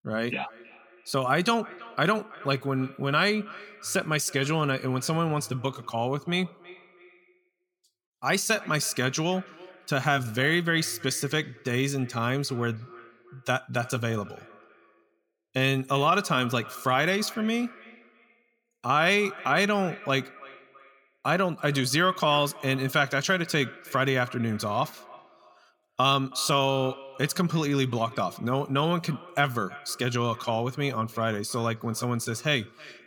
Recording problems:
echo of what is said; faint; throughout; 320 ms later, 20 dB below the speech

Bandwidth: 18.5 kHz